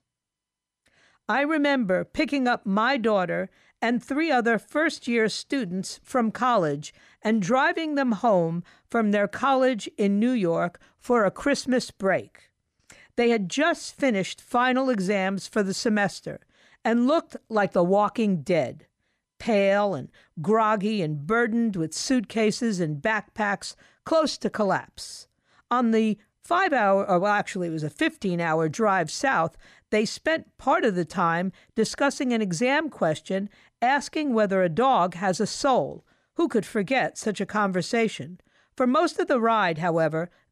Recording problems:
none

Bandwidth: 14.5 kHz